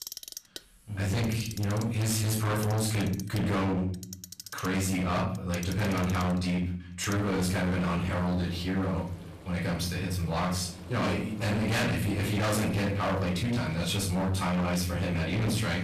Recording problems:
distortion; heavy; 30% of the sound clipped
off-mic speech; far
room echo; slight; dies away in 0.5 s
household noises; noticeable; throughout; 15 dB below the speech

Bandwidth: 14.5 kHz